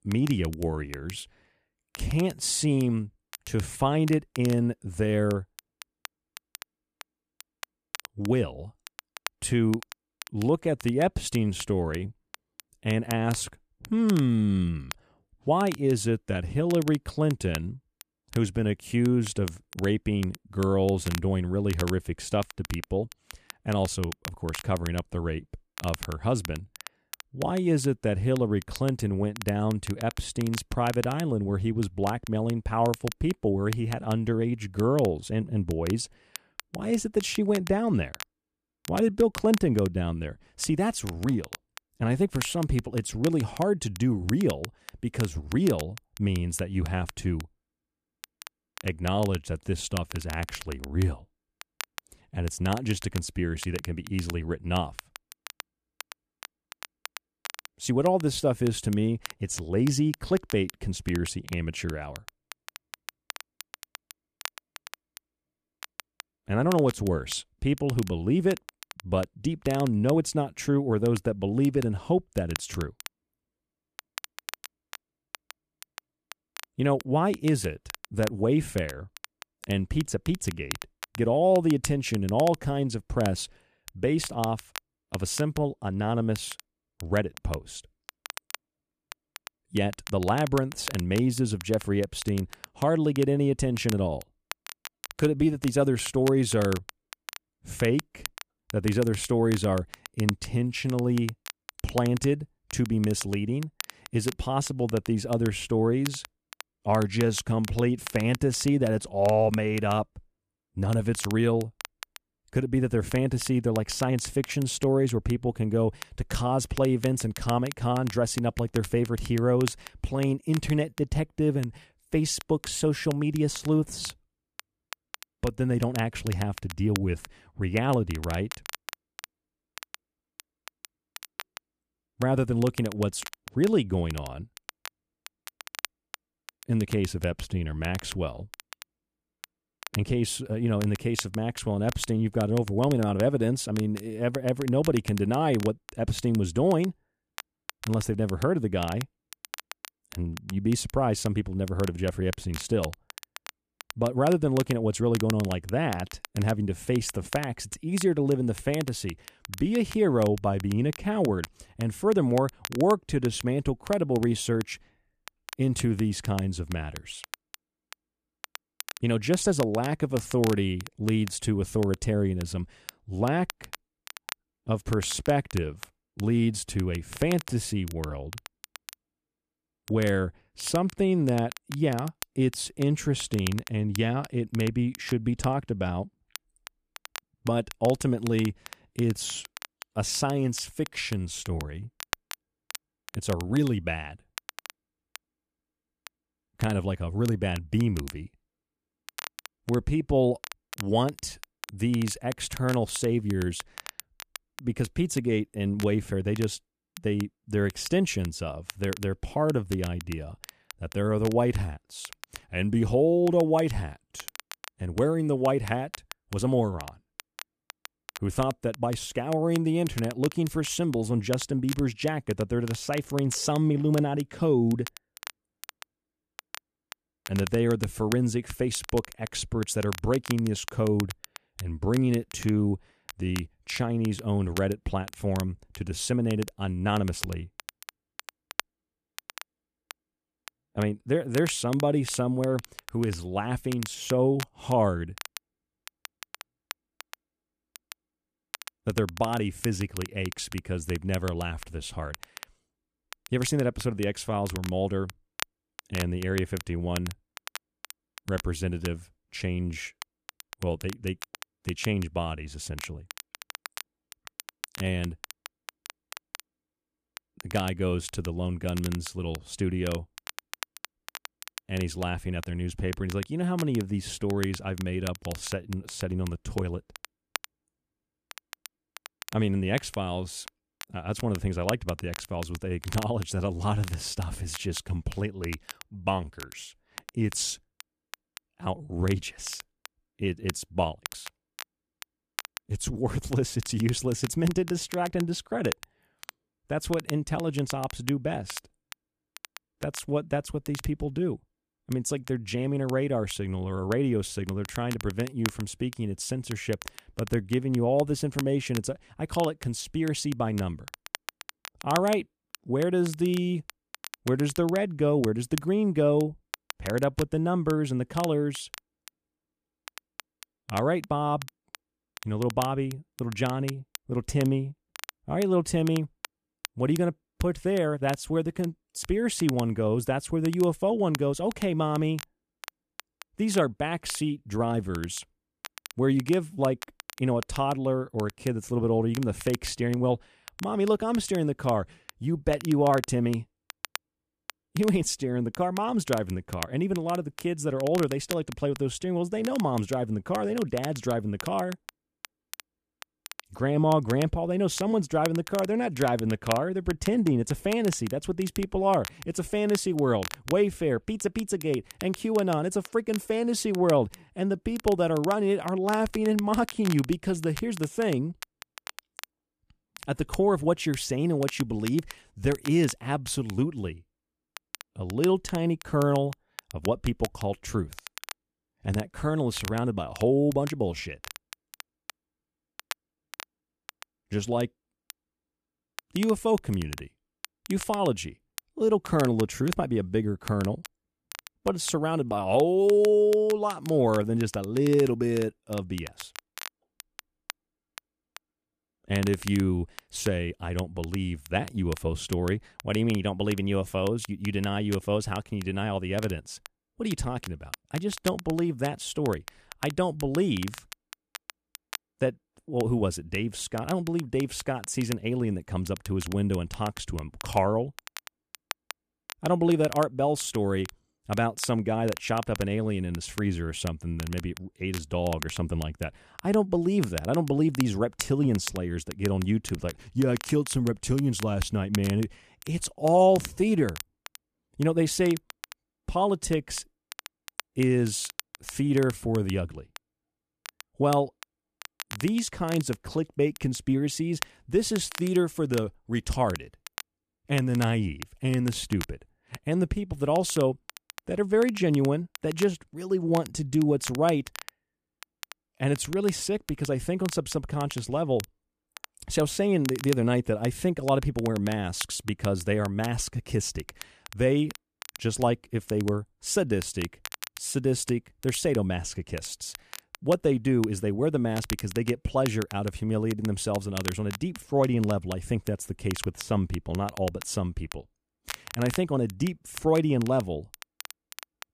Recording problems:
crackle, like an old record; noticeable; 15 dB below the speech

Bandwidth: 14.5 kHz